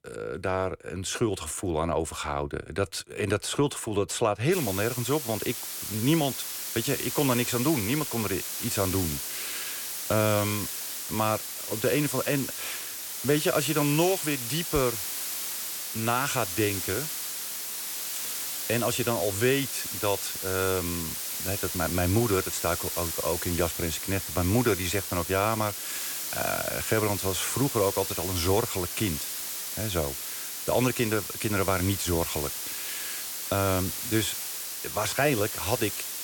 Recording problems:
hiss; loud; from 4.5 s on; 3 dB below the speech

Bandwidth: 17.5 kHz